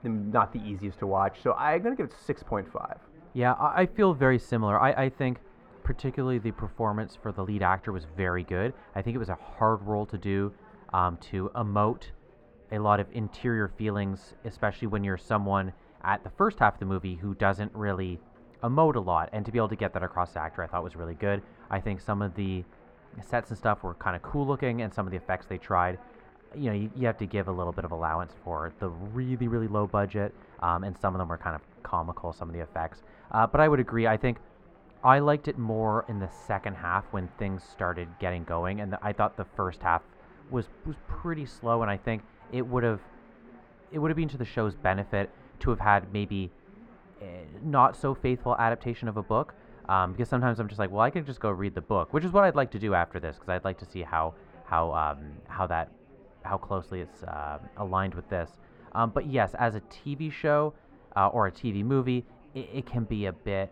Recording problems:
muffled; very; fading above 3.5 kHz
chatter from many people; faint; throughout; 25 dB below the speech

